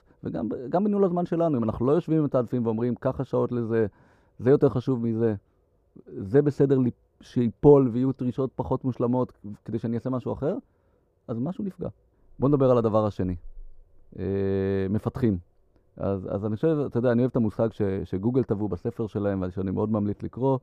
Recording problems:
muffled; very; fading above 1.5 kHz

